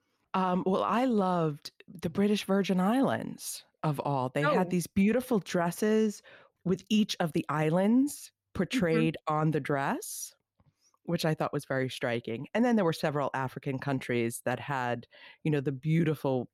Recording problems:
none

